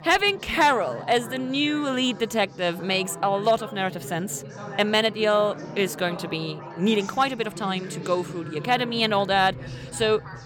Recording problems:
background chatter; noticeable; throughout; 4 voices, 15 dB below the speech

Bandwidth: 17.5 kHz